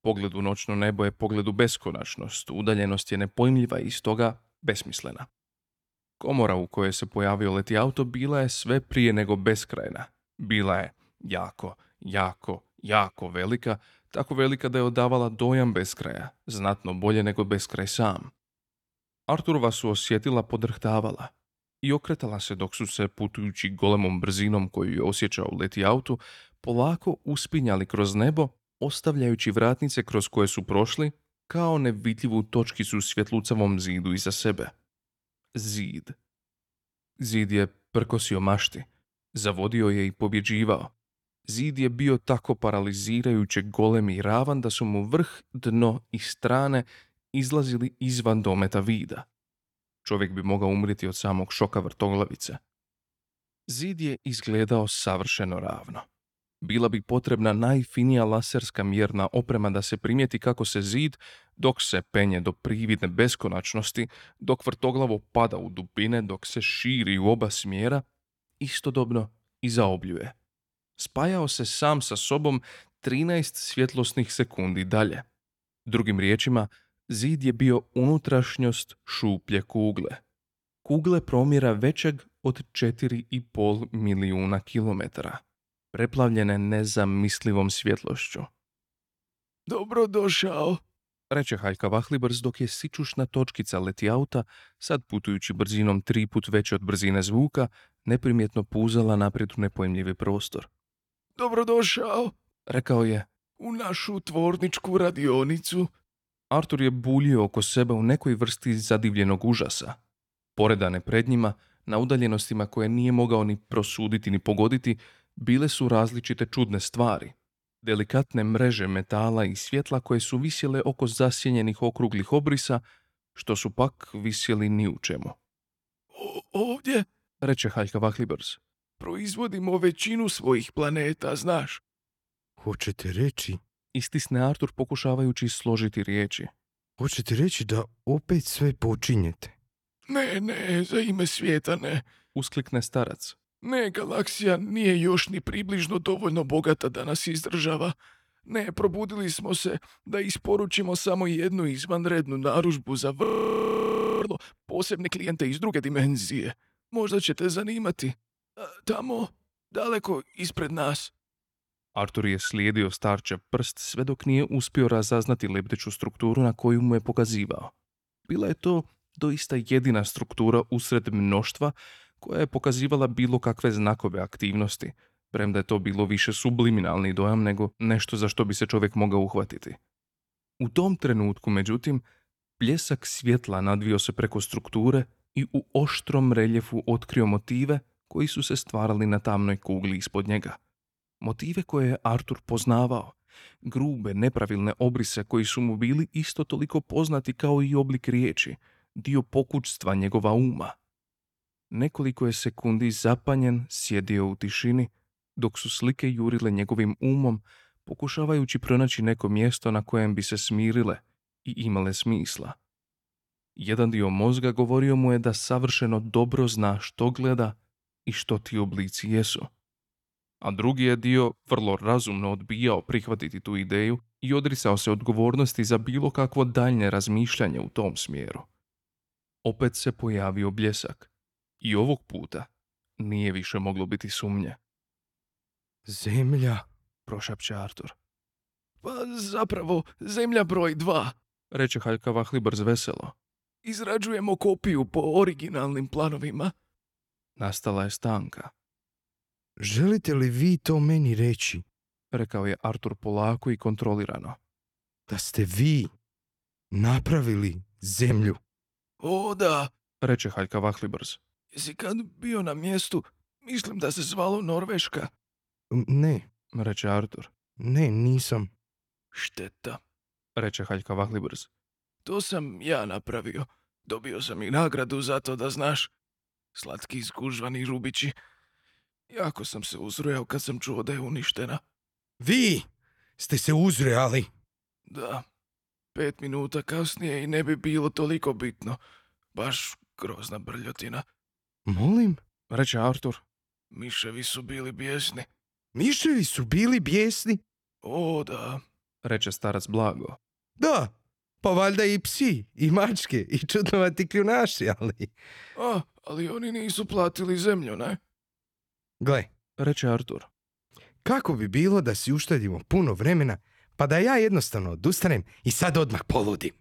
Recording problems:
audio freezing; at 2:33 for 1 s

